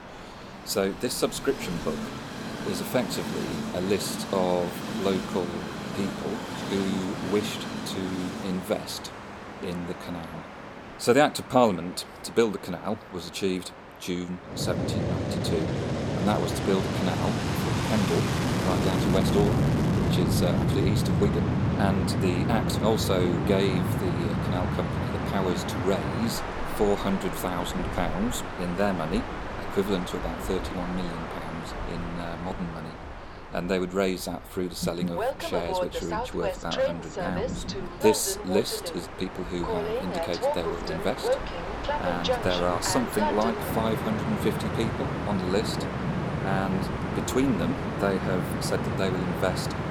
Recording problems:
train or aircraft noise; loud; throughout; as loud as the speech

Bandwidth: 18 kHz